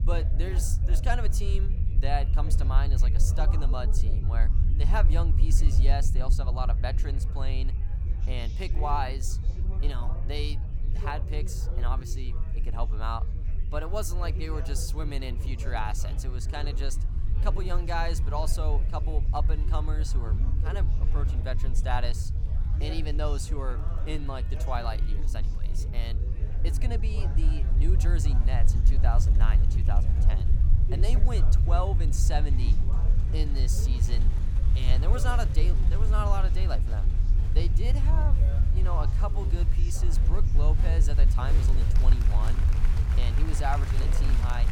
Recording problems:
low rumble; loud; throughout; 9 dB below the speech
chatter from many people; noticeable; throughout; 10 dB below the speech

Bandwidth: 17.5 kHz